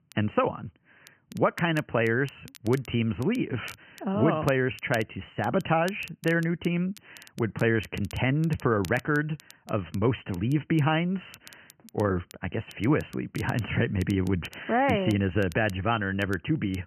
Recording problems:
high frequencies cut off; severe; nothing above 3 kHz
crackle, like an old record; faint; 25 dB below the speech

